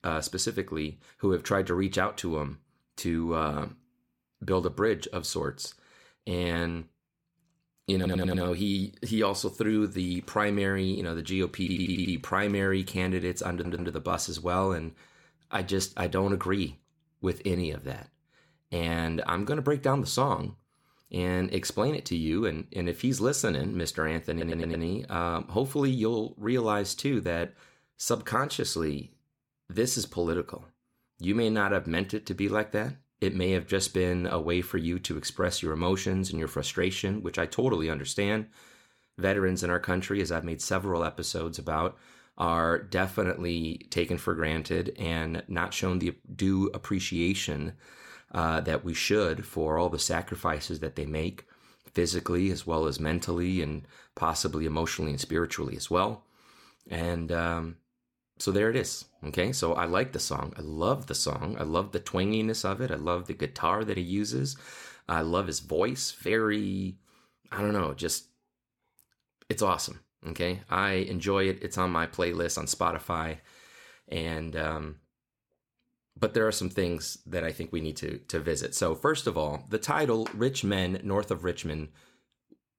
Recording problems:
audio stuttering; 4 times, first at 8 s

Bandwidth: 17.5 kHz